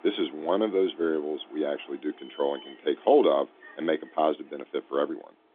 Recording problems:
phone-call audio; nothing above 3.5 kHz
traffic noise; faint; throughout; 25 dB below the speech

